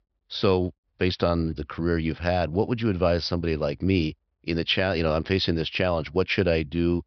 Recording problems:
high frequencies cut off; noticeable; nothing above 5.5 kHz

